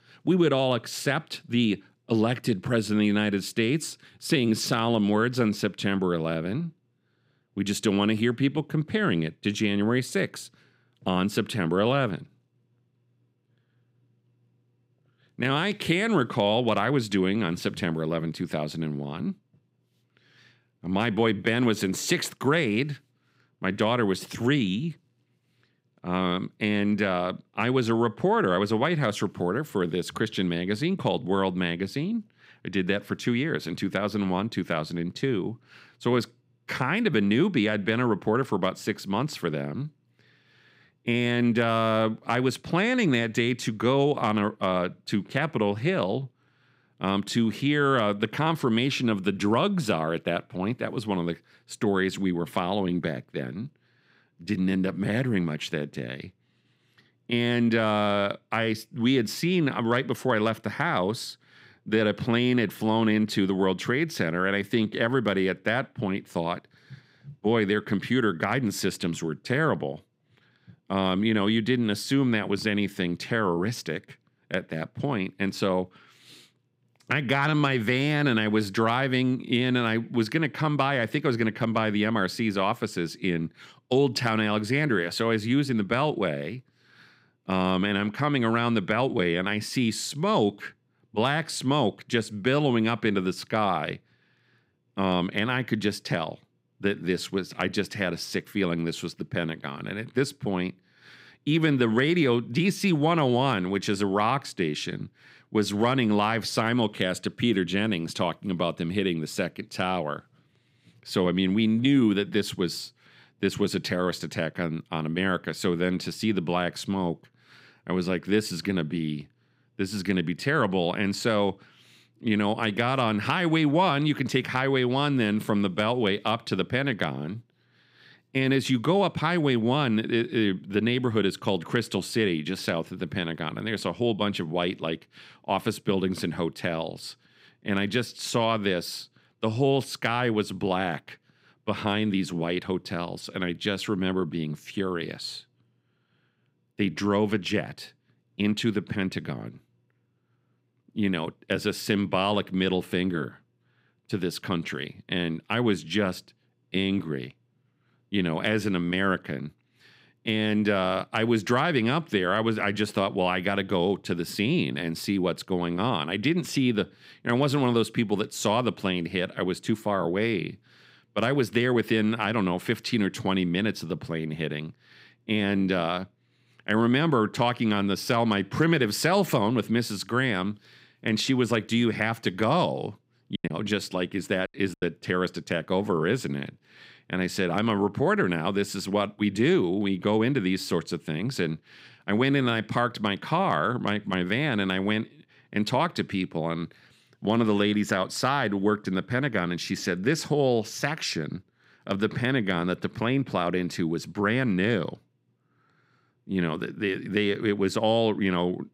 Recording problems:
choppy; very; from 3:03 to 3:05; 7% of the speech affected

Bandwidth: 15.5 kHz